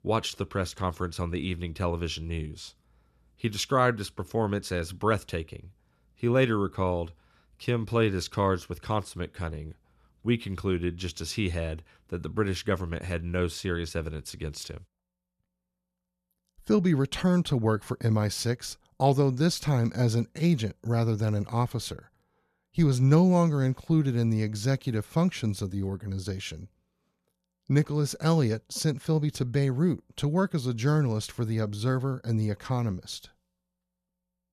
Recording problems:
none

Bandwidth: 14 kHz